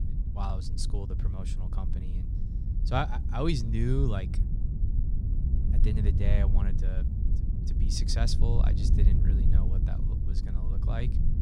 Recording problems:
wind noise on the microphone; heavy; 8 dB below the speech

